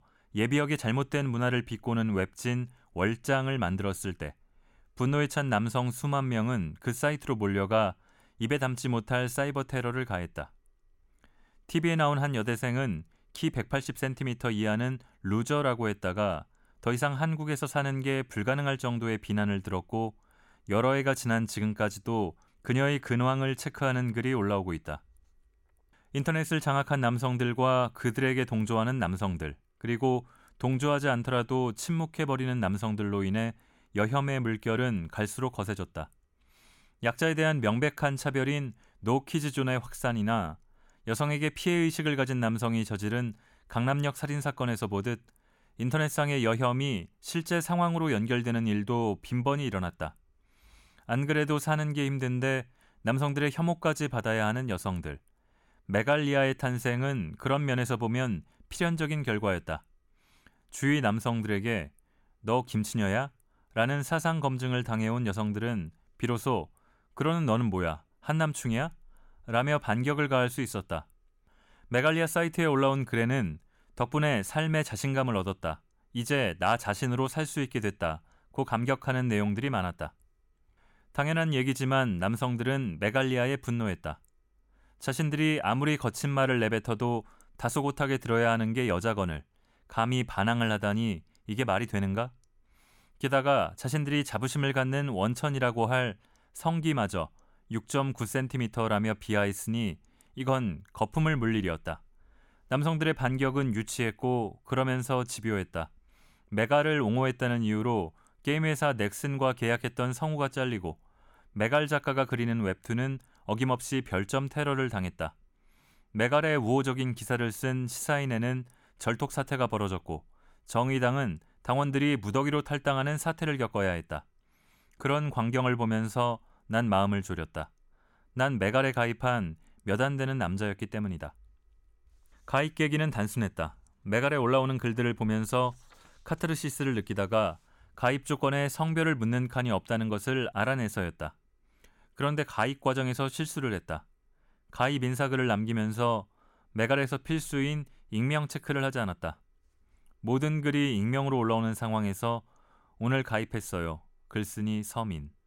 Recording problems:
none

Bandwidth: 17.5 kHz